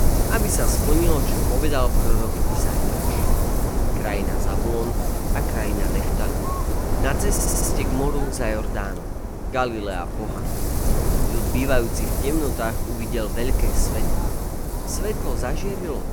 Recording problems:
wind noise on the microphone; heavy; 2 dB below the speech
audio stuttering; at 7.5 s

